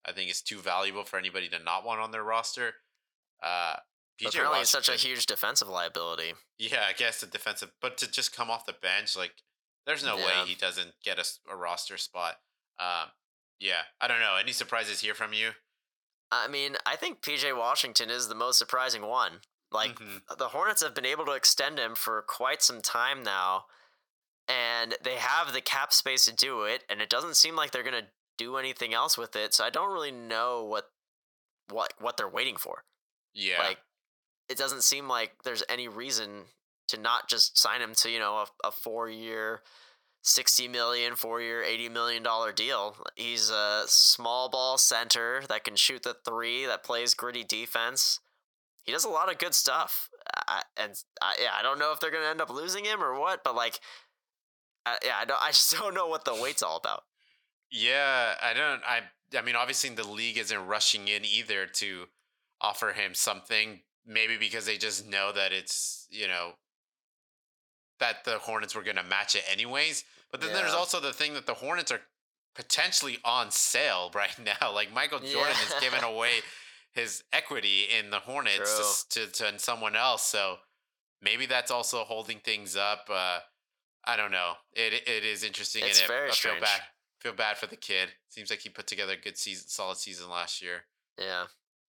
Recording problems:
thin; very; fading below 750 Hz

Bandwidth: 18 kHz